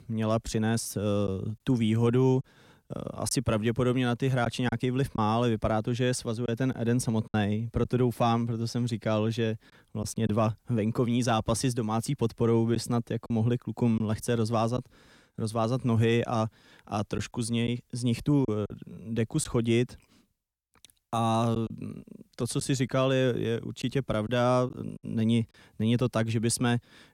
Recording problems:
choppy; occasionally; 3% of the speech affected

